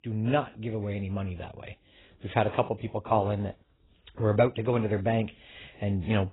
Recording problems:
garbled, watery; badly; nothing above 4 kHz

